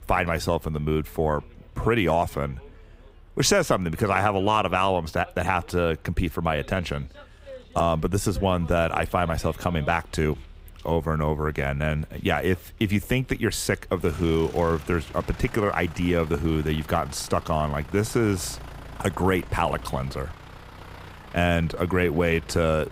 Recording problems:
traffic noise; noticeable; throughout; 20 dB below the speech

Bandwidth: 15.5 kHz